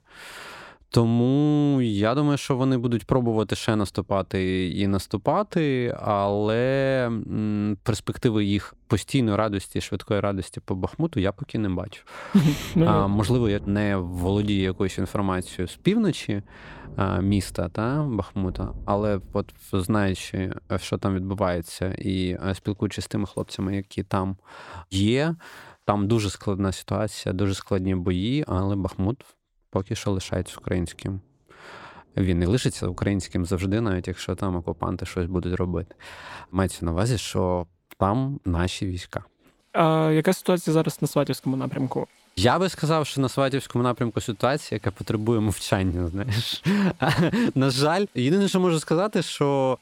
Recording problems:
rain or running water; faint; throughout; 20 dB below the speech

